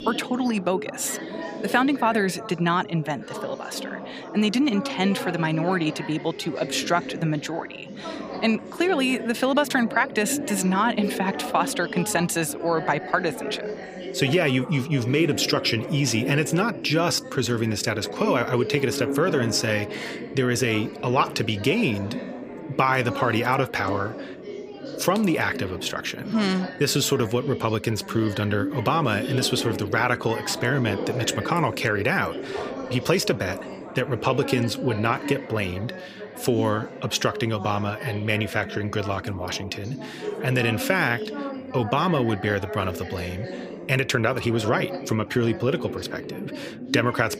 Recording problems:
background chatter; loud; throughout; 4 voices, 9 dB below the speech

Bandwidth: 15 kHz